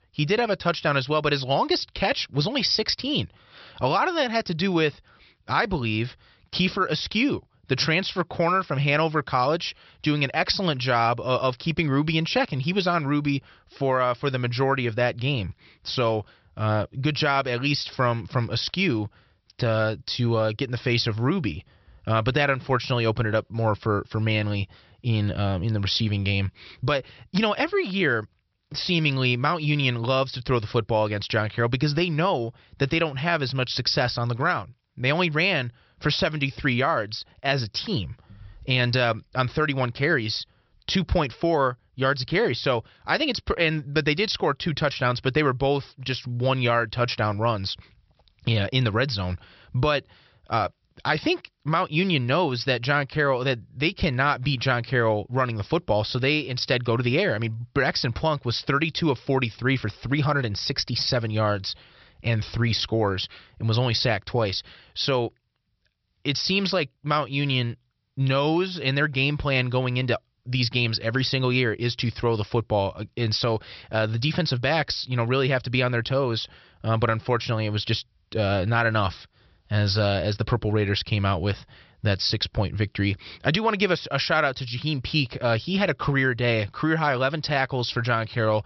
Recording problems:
high frequencies cut off; noticeable; nothing above 5.5 kHz

